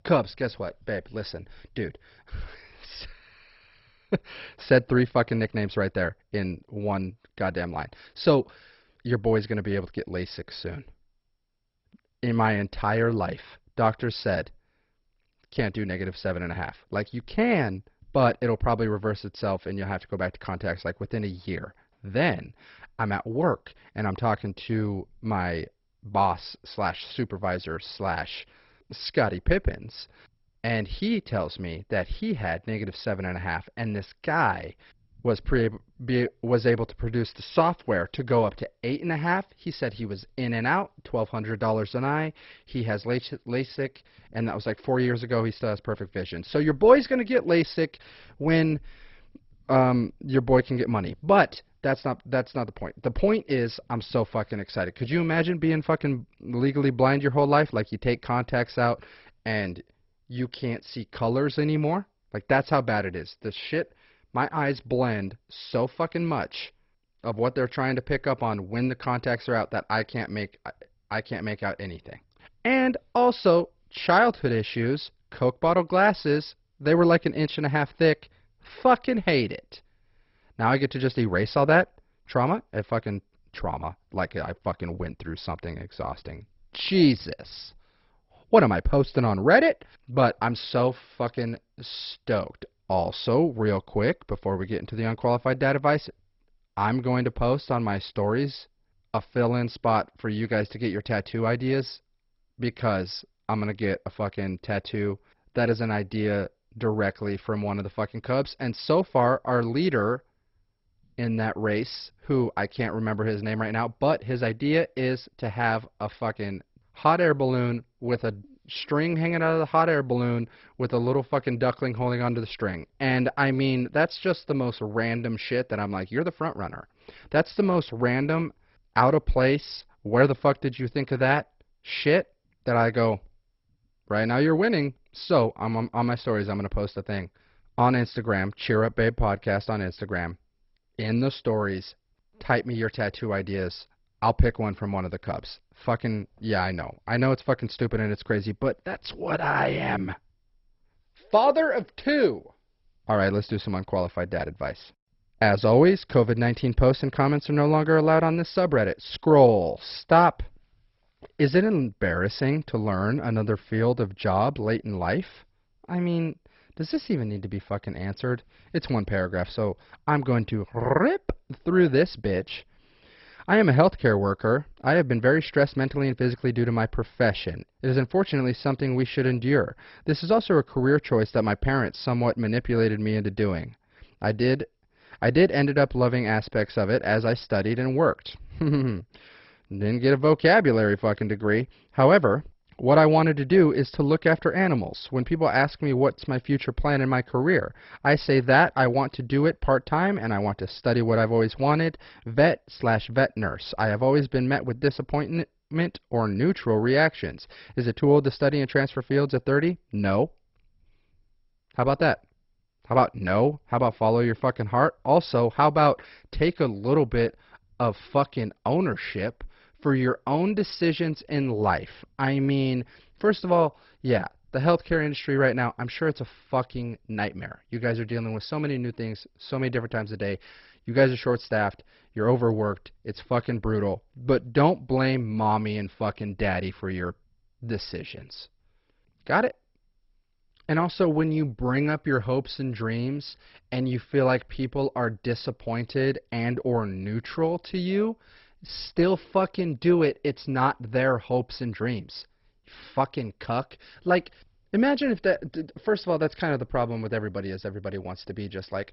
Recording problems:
garbled, watery; badly; nothing above 5.5 kHz

